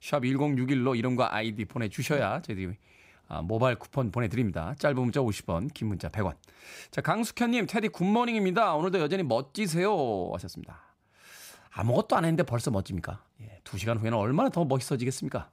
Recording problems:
none

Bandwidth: 15.5 kHz